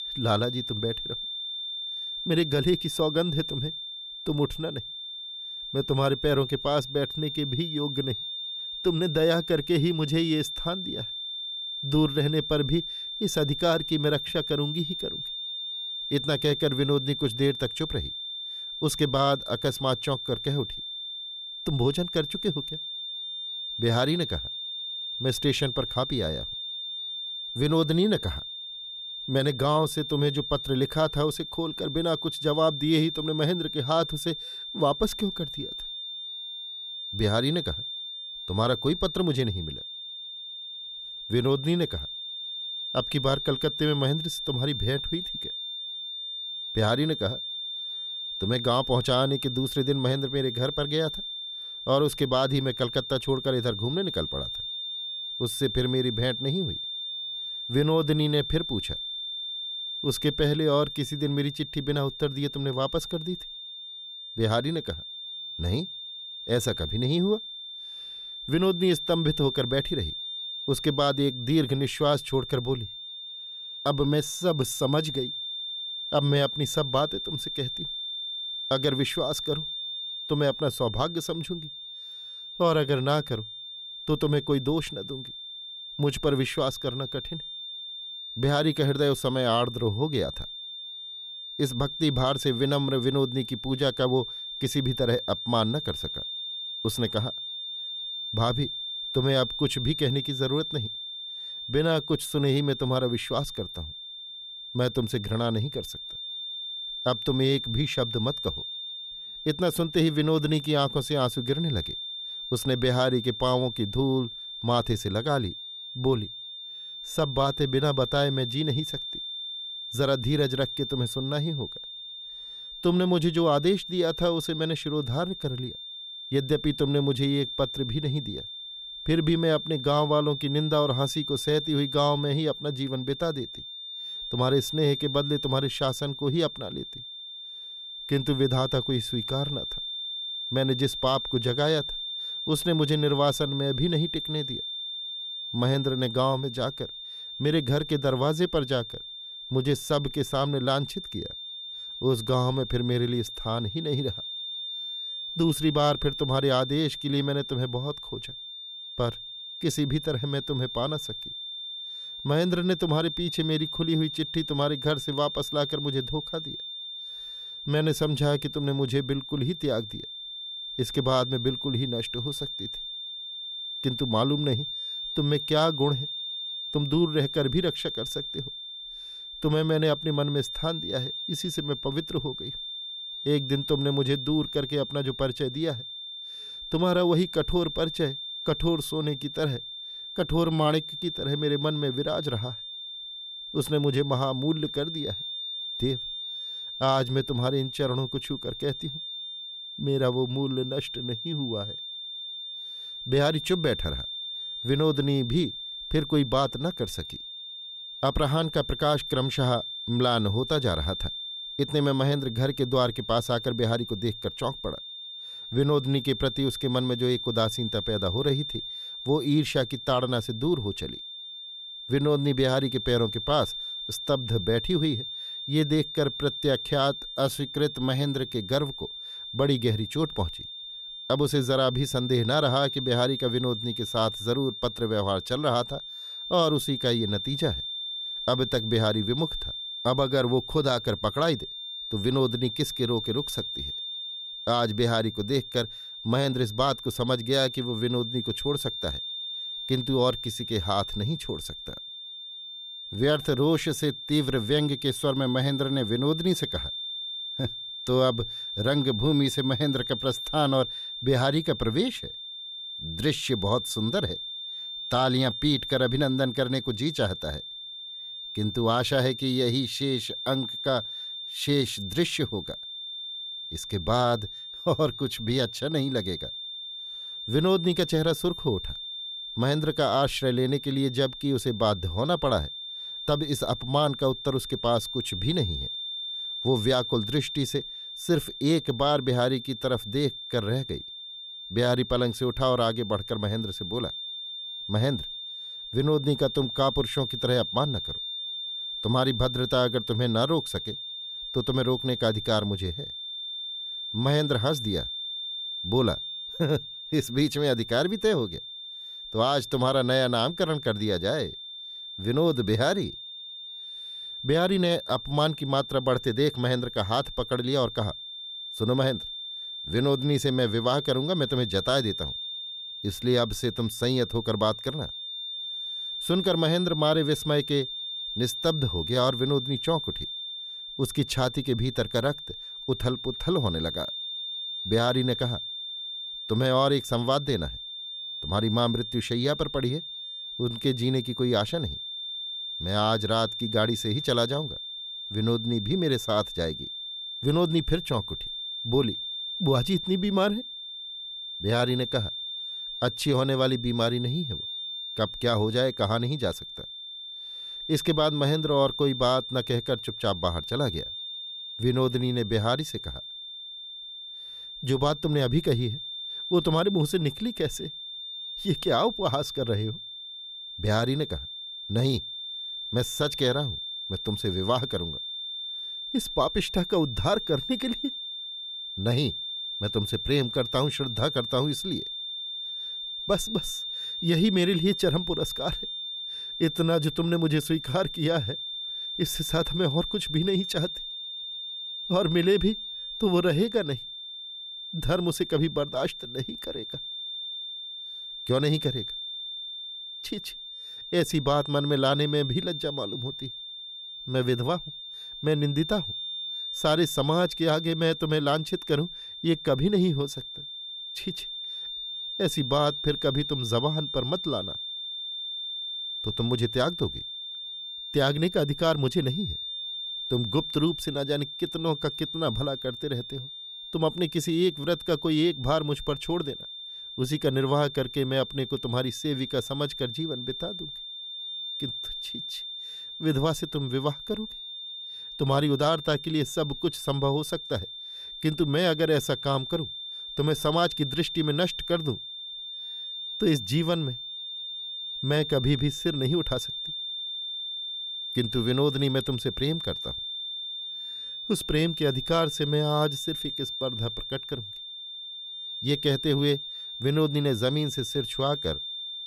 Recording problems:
high-pitched whine; loud; throughout; 3.5 kHz, 7 dB below the speech

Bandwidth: 14.5 kHz